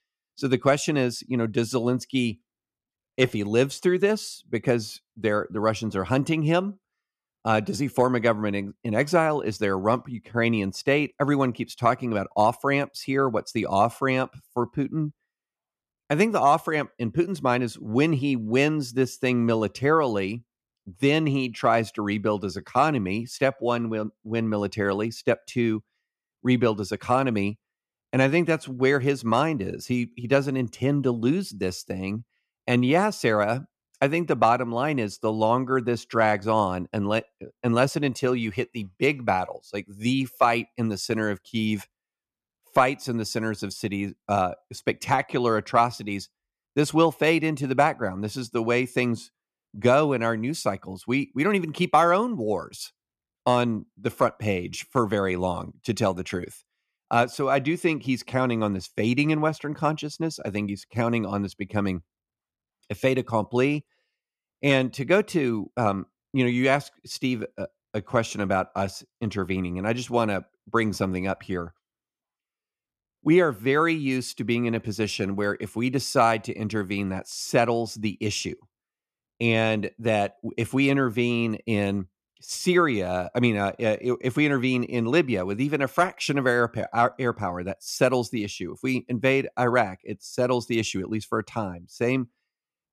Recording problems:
none

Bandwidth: 14 kHz